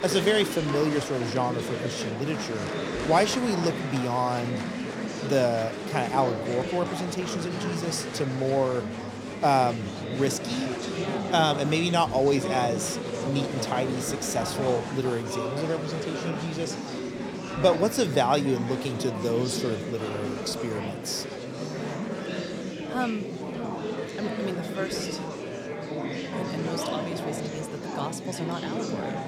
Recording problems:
murmuring crowd; loud; throughout; 4 dB below the speech

